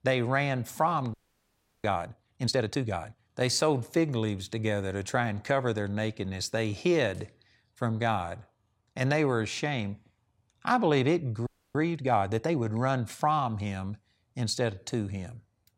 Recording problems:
audio freezing; at 1 s for 0.5 s and at 11 s

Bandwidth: 16 kHz